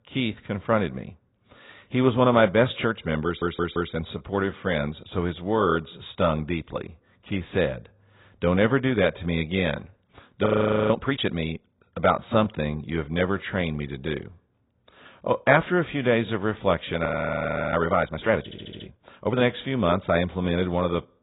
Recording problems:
garbled, watery; badly
high frequencies cut off; severe; nothing above 4 kHz
audio stuttering; at 3.5 s and at 18 s
audio freezing; at 10 s and at 17 s for 0.5 s

